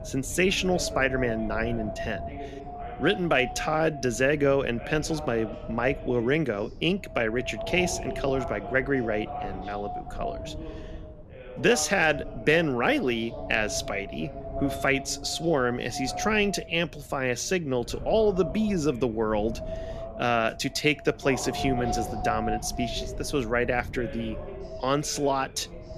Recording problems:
voice in the background; noticeable; throughout; 15 dB below the speech
wind noise on the microphone; occasional gusts; 10 dB below the speech

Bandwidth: 14.5 kHz